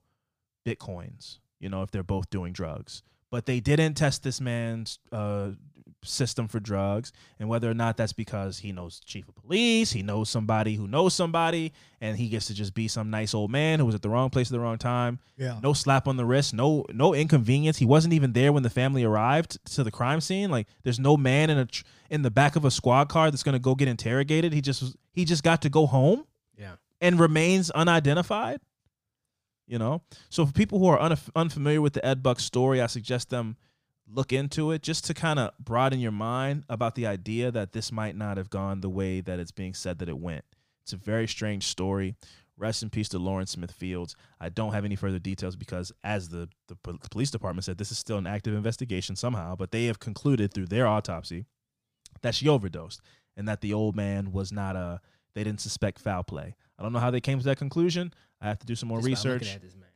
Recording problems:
none

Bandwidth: 15 kHz